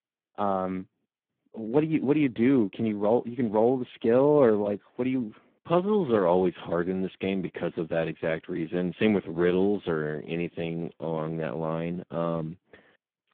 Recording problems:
phone-call audio; poor line

